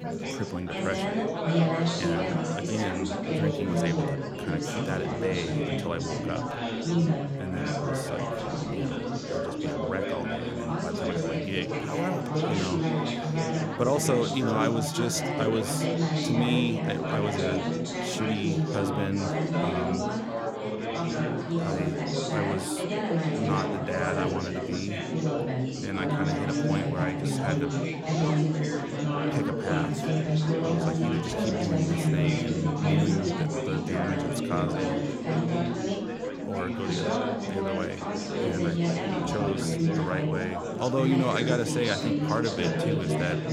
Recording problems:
chatter from many people; very loud; throughout; 4 dB above the speech

